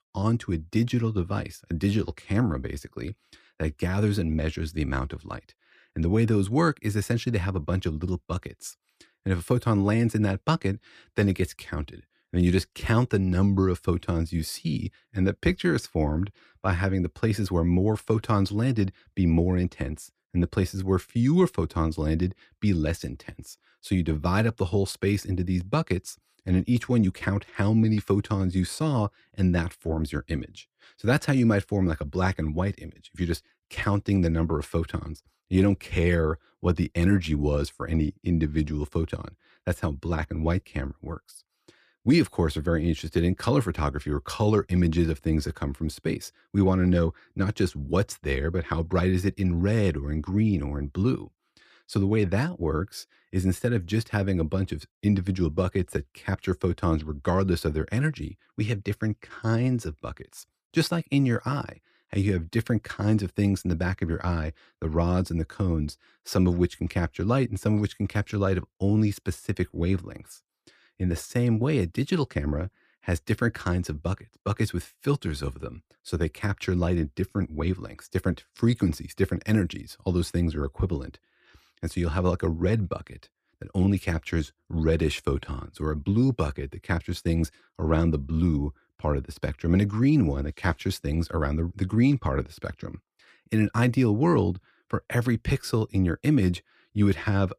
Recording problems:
none

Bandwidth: 14.5 kHz